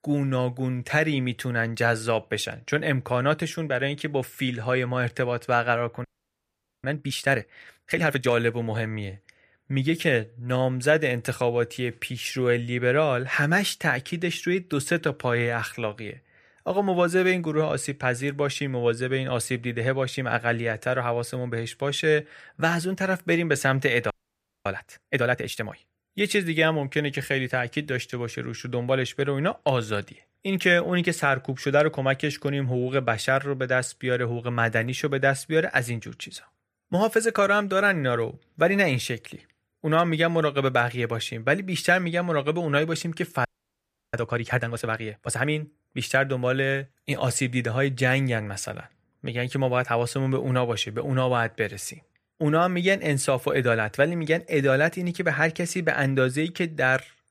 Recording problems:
audio freezing; at 6 s for 1 s, at 24 s for 0.5 s and at 43 s for 0.5 s

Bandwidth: 15 kHz